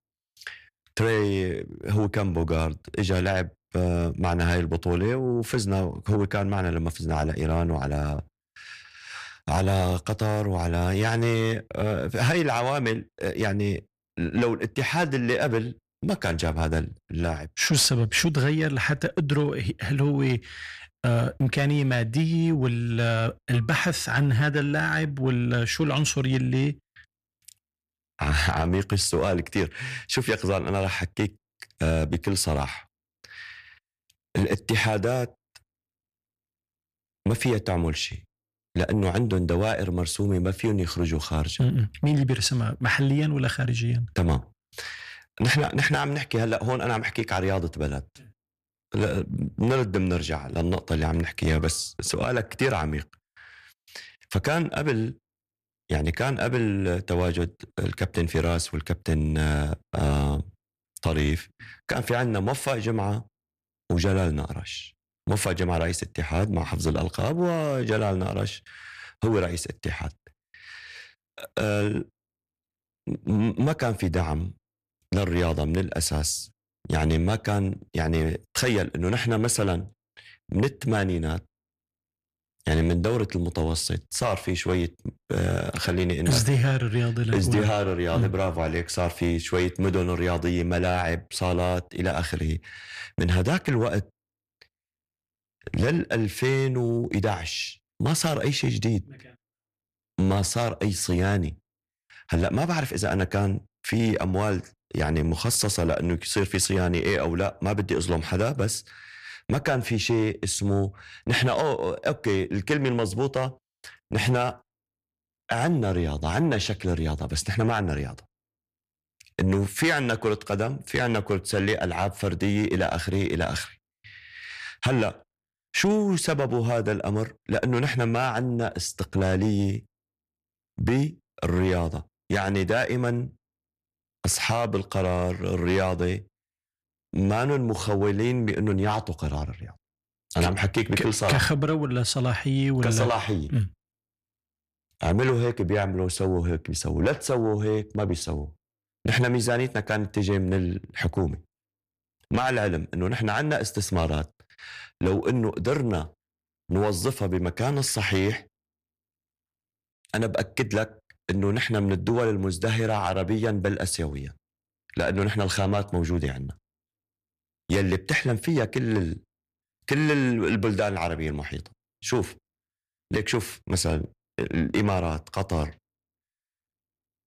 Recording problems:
distortion; slight; 10 dB below the speech

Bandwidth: 14.5 kHz